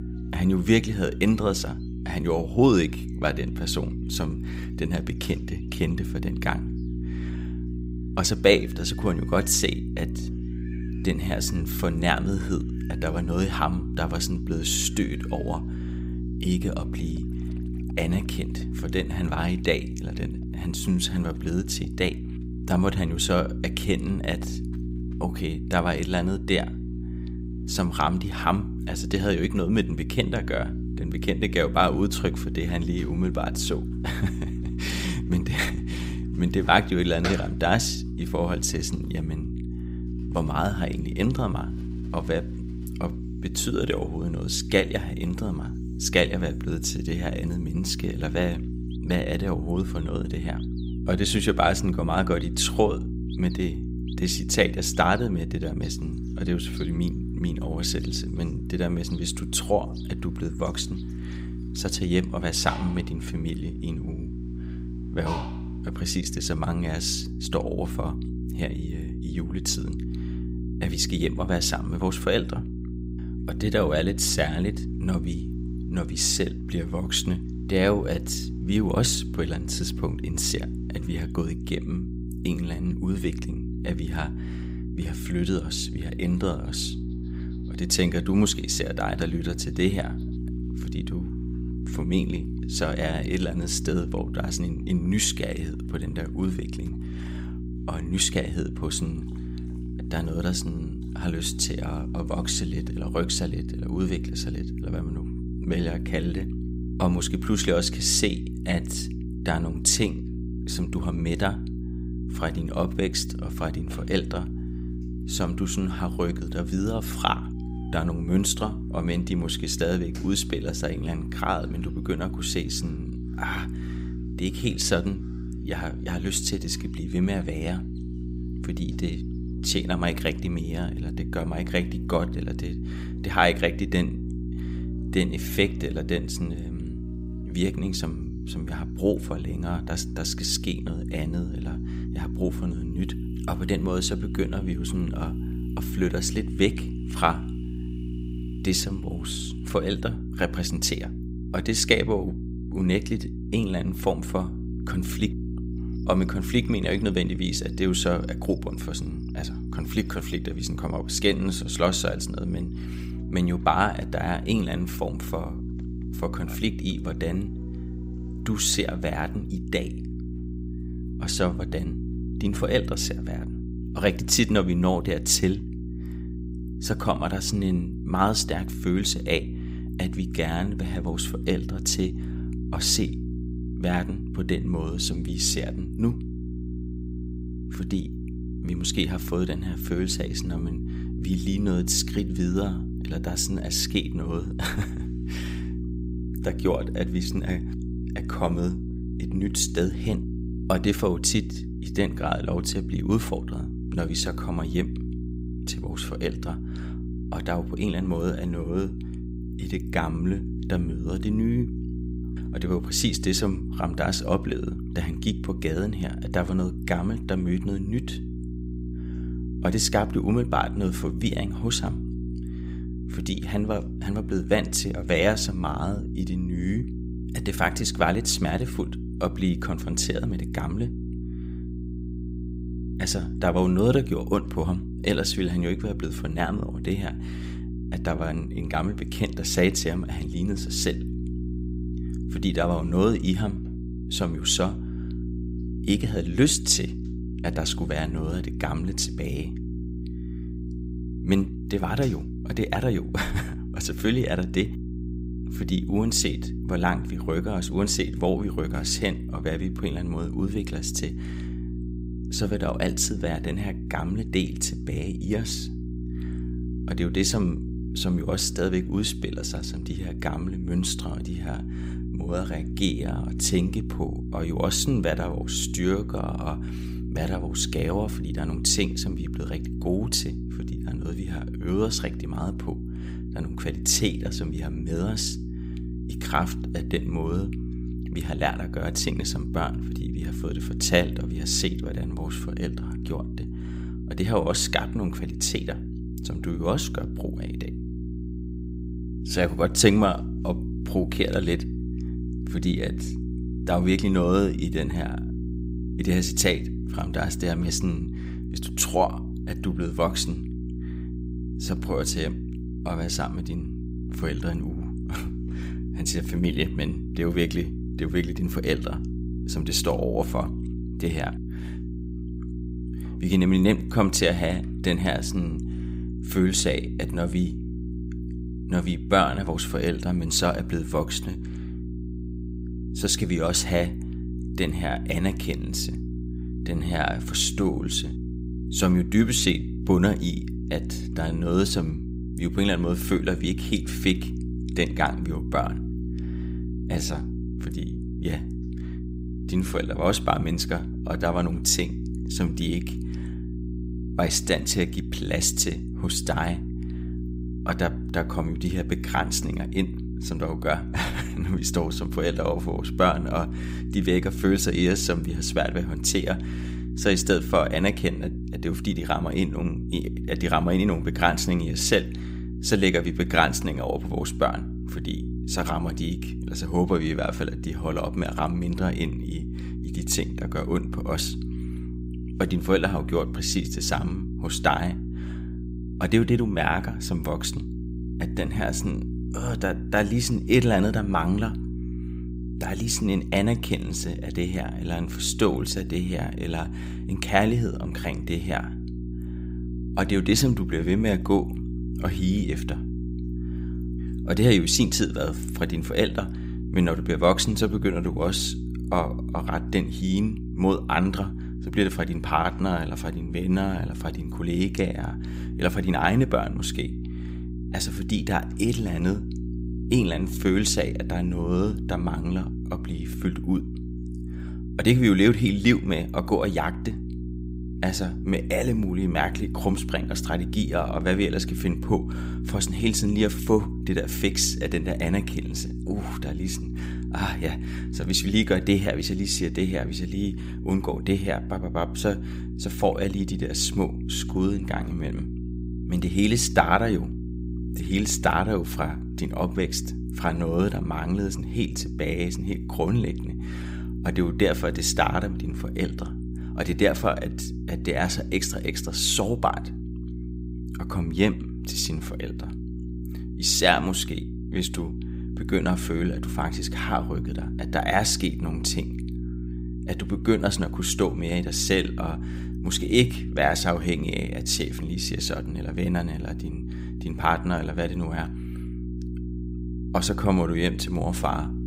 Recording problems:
electrical hum; noticeable; throughout; 60 Hz, 15 dB below the speech
animal sounds; faint; until 2:53; 30 dB below the speech

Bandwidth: 15.5 kHz